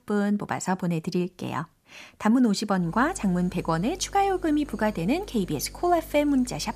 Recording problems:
electrical hum; faint; from 3 s on; 50 Hz, 25 dB below the speech

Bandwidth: 14.5 kHz